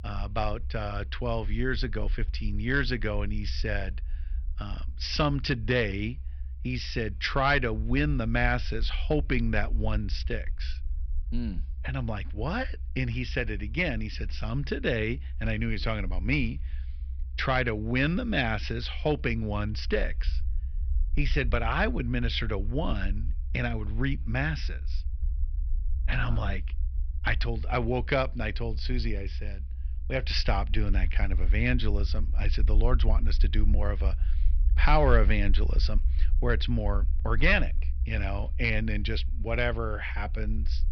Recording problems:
high frequencies cut off; noticeable; nothing above 5.5 kHz
low rumble; faint; throughout; 25 dB below the speech

